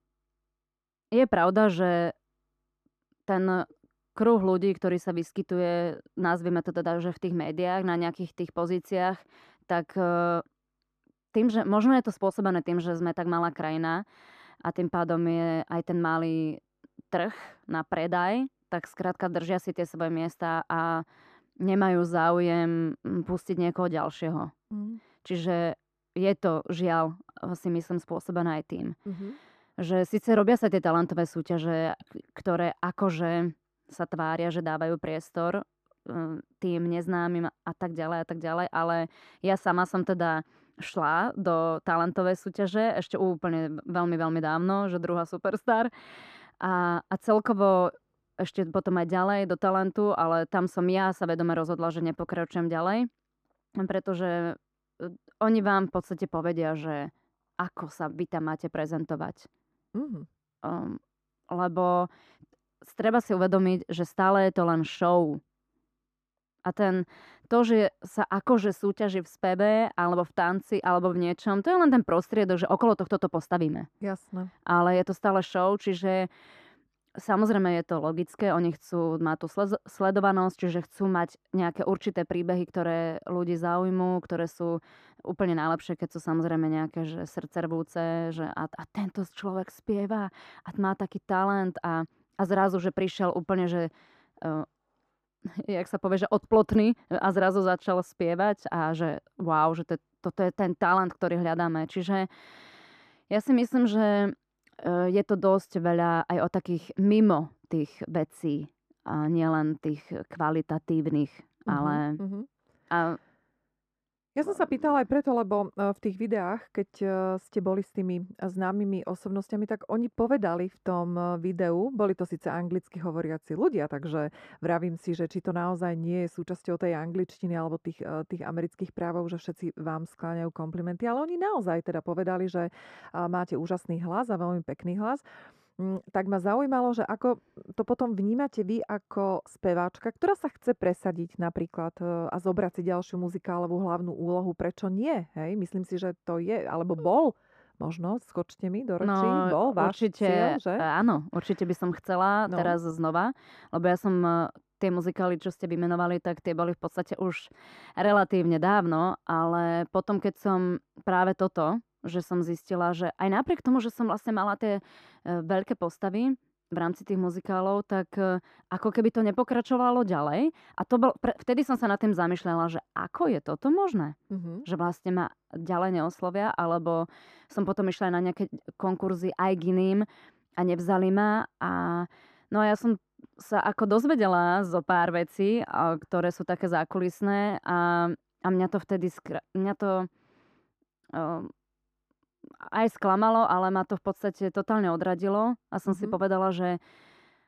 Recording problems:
muffled; very; fading above 2 kHz

